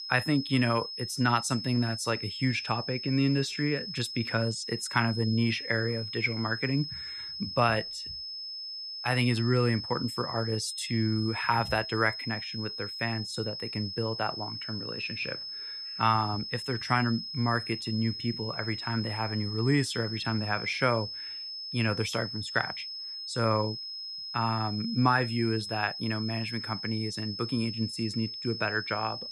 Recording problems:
high-pitched whine; loud; throughout; 5 kHz, 6 dB below the speech

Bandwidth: 15.5 kHz